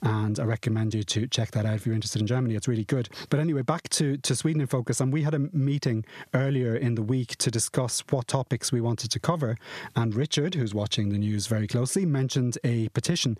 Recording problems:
squashed, flat; somewhat

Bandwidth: 14.5 kHz